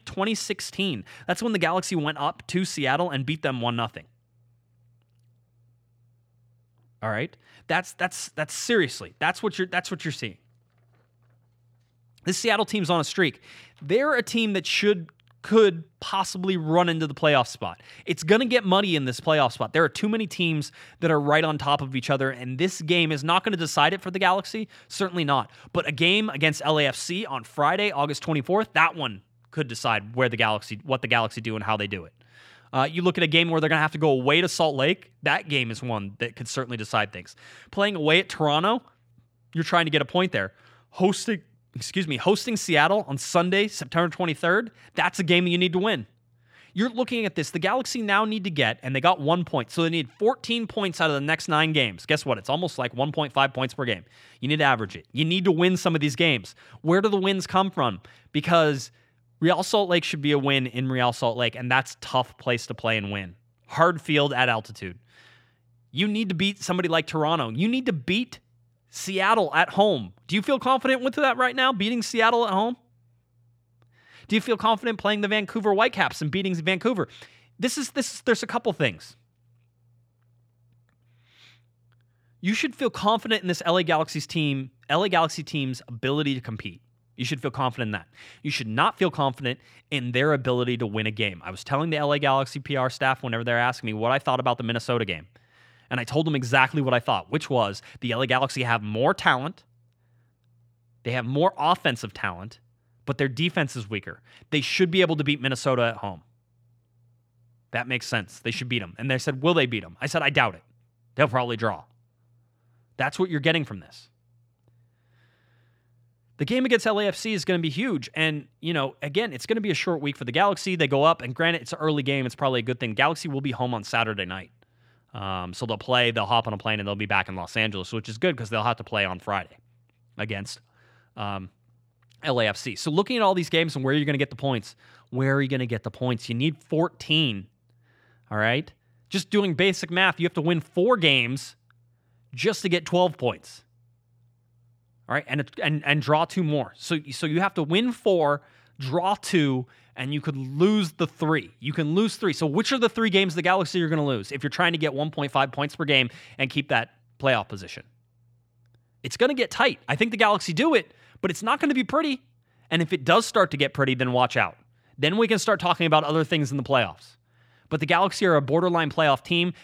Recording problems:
none

